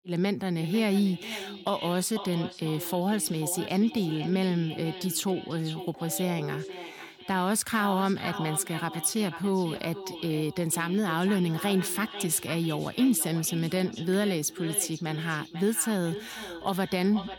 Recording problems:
echo of what is said; noticeable; throughout; 490 ms later, 10 dB below the speech
phone ringing; faint; from 6 to 7 s; peak 10 dB below the speech

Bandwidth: 17.5 kHz